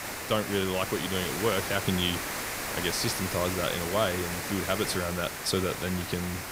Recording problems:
hiss; loud; throughout; 3 dB below the speech

